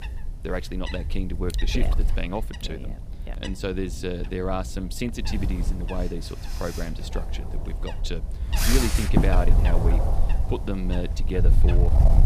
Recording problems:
wind noise on the microphone; heavy; 2 dB below the speech

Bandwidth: 15 kHz